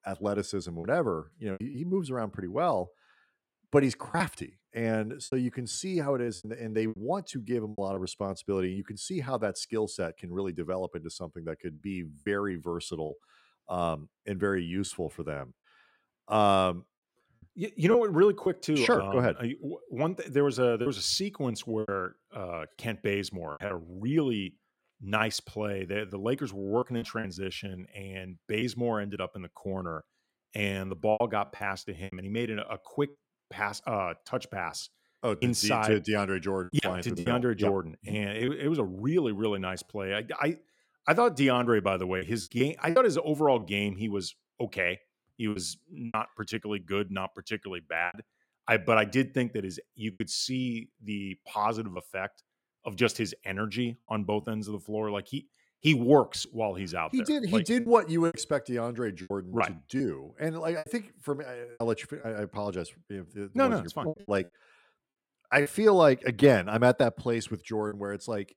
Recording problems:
choppy; very; 5% of the speech affected

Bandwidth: 16.5 kHz